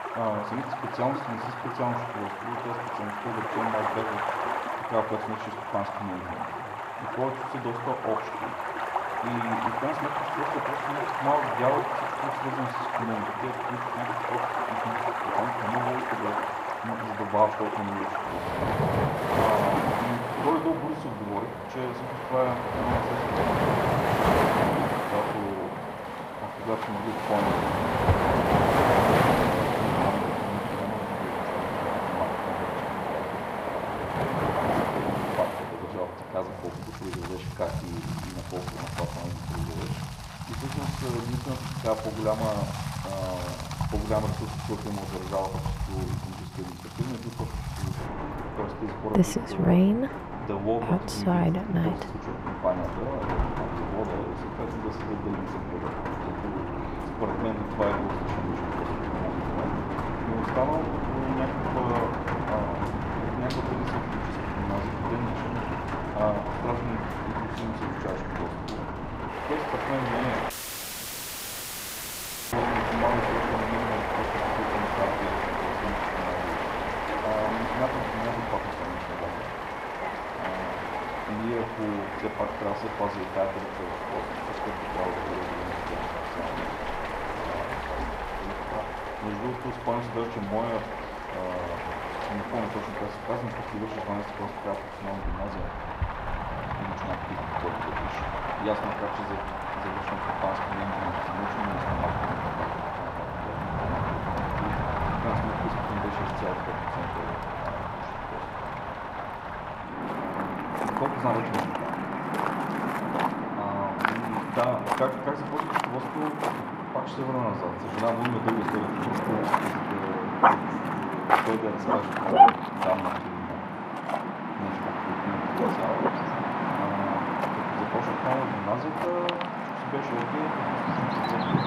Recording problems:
muffled; very; fading above 3 kHz
room echo; slight; dies away in 0.9 s
off-mic speech; somewhat distant
rain or running water; very loud; throughout; 4 dB above the speech
animal sounds; very loud; from 56 s on; 3 dB above the speech
audio cutting out; at 1:11 for 2 s

